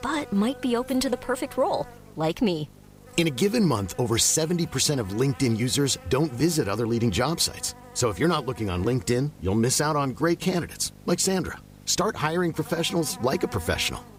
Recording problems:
electrical hum; noticeable; throughout; 50 Hz, 20 dB below the speech

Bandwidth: 15.5 kHz